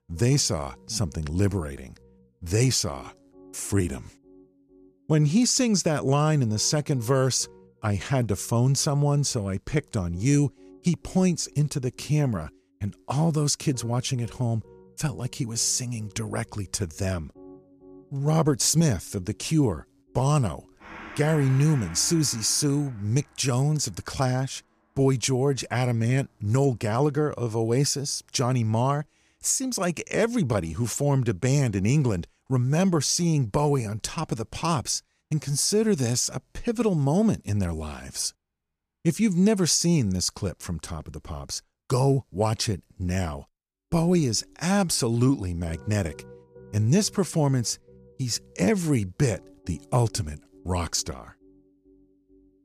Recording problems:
background music; faint; throughout; 25 dB below the speech

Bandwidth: 14.5 kHz